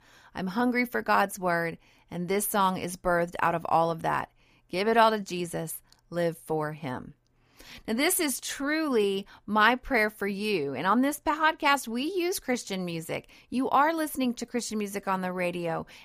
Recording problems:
none

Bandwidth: 15 kHz